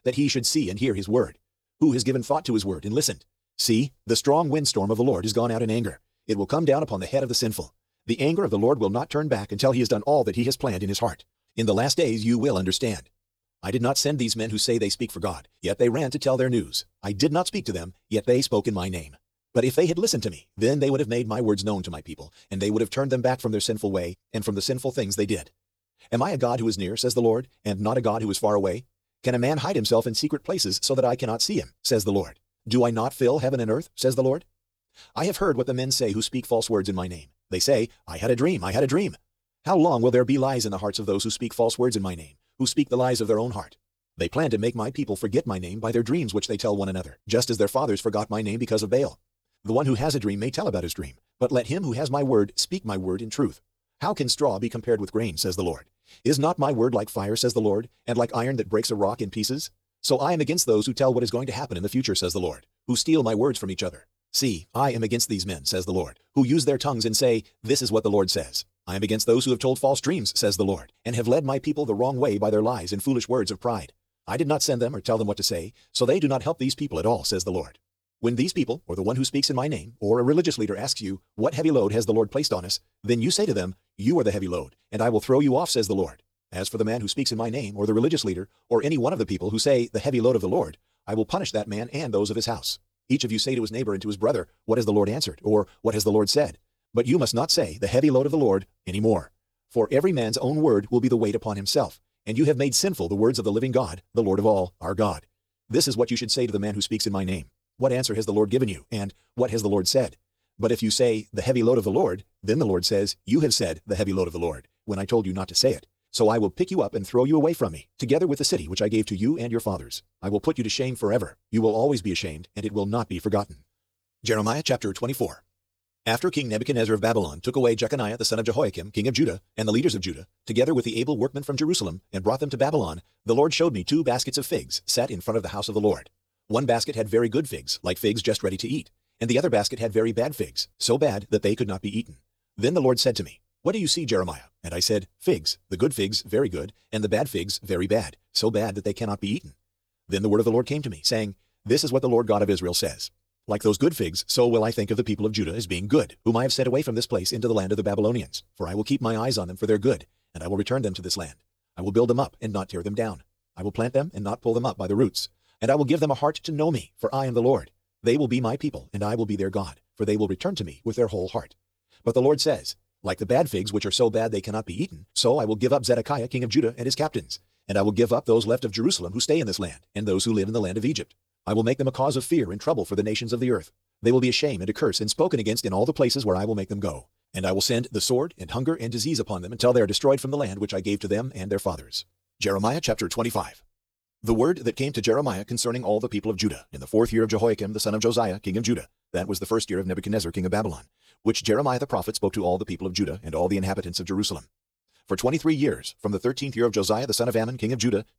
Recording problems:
wrong speed, natural pitch; too fast; 1.5 times normal speed

